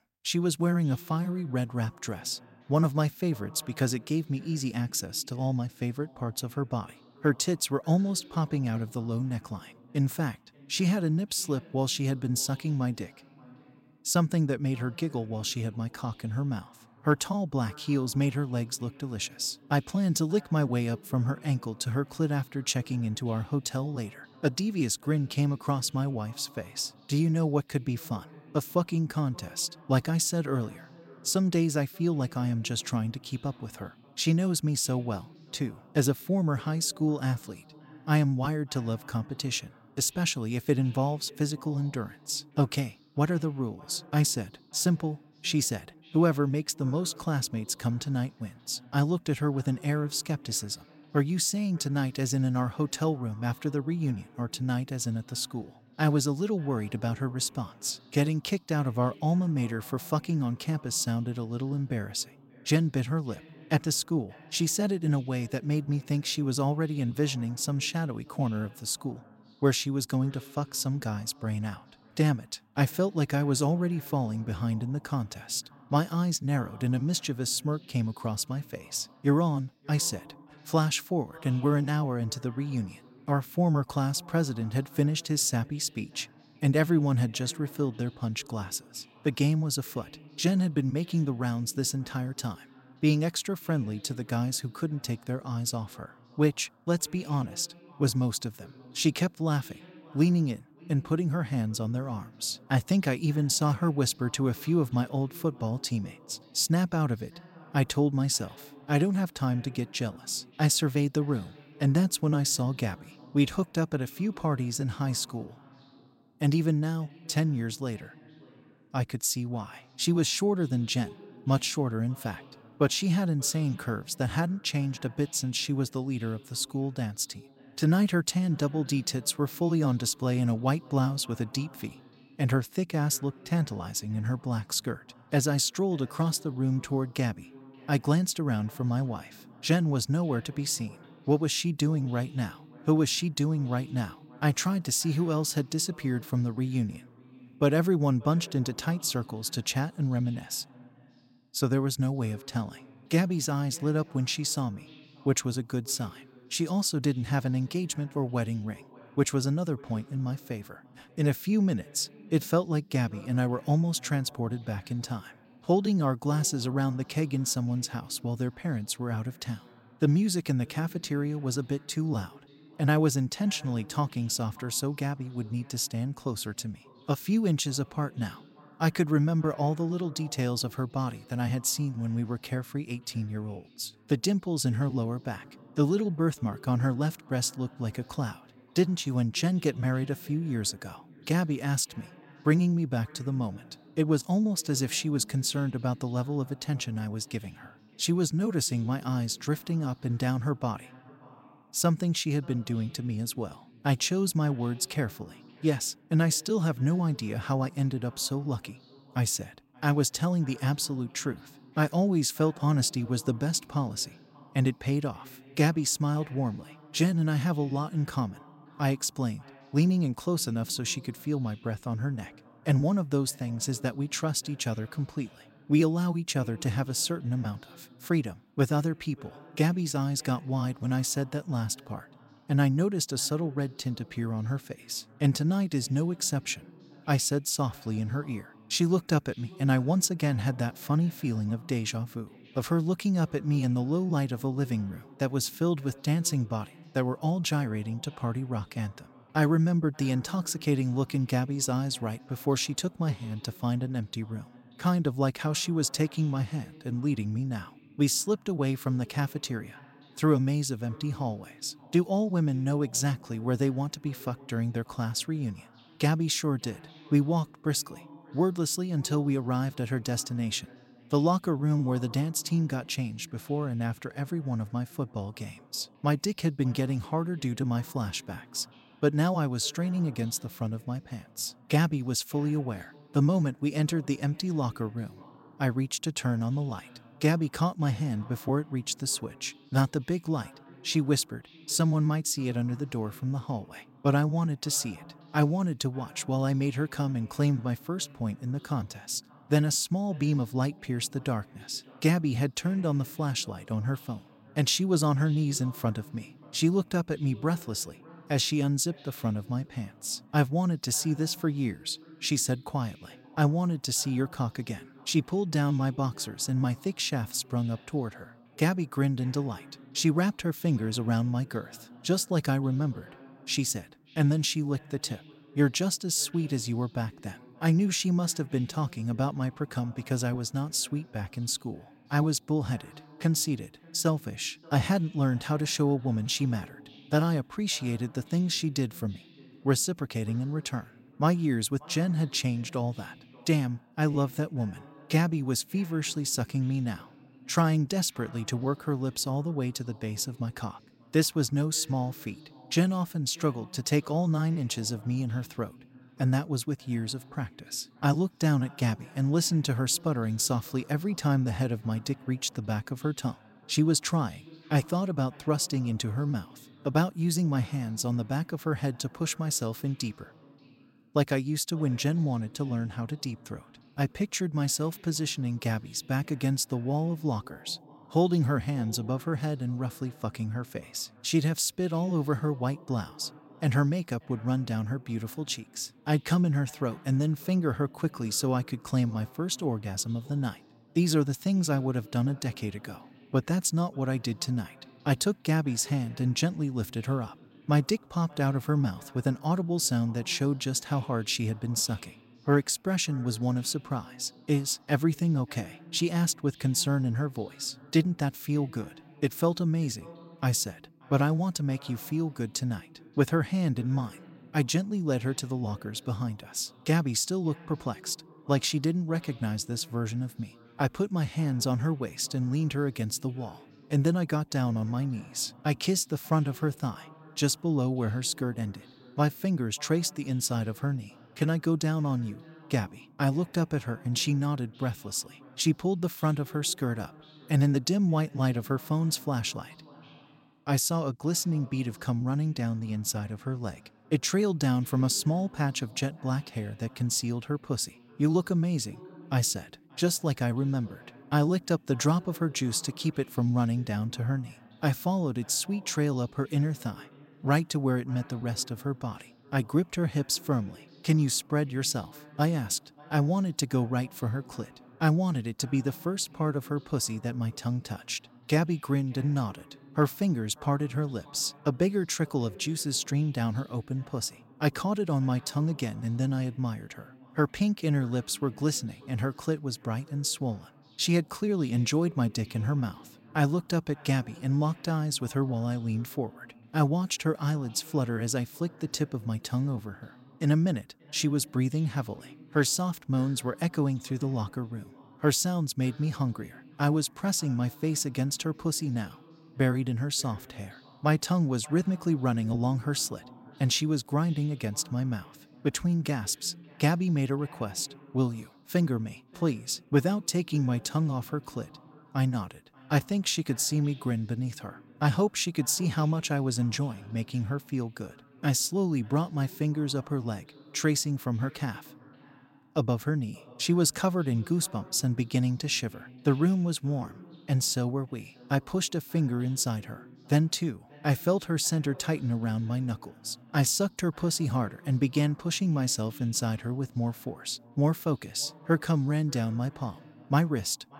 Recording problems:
echo of what is said; faint; throughout; 580 ms later, 25 dB below the speech

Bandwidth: 16 kHz